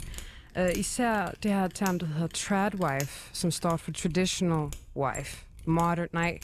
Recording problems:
machinery noise; noticeable; throughout; 15 dB below the speech

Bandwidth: 13.5 kHz